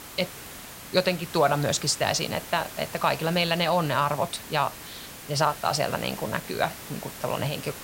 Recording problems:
hiss; noticeable; throughout; 15 dB below the speech

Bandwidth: 16 kHz